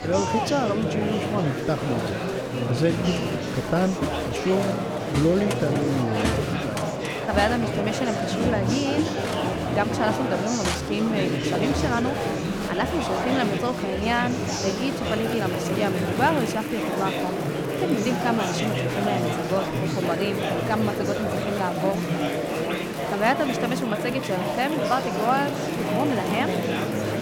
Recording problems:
murmuring crowd; very loud; throughout; as loud as the speech

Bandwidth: 19 kHz